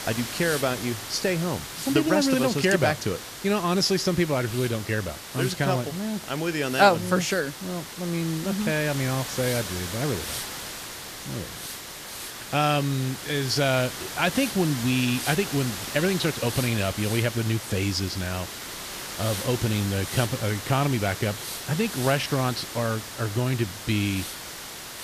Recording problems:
hiss; loud; throughout; 8 dB below the speech

